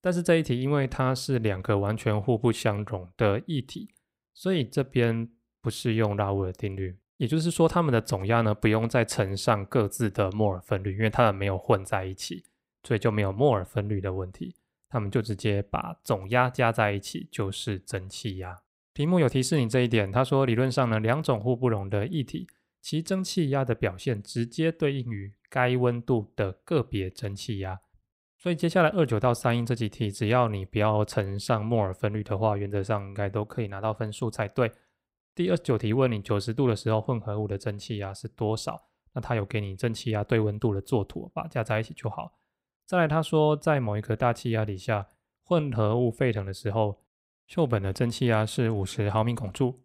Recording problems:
none

